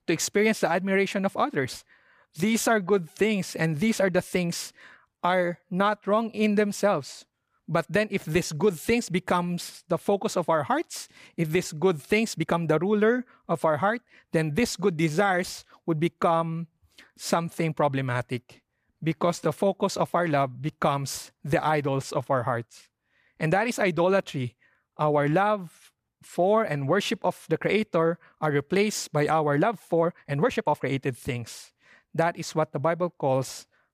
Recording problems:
uneven, jittery; strongly; from 2.5 to 31 s

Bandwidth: 15 kHz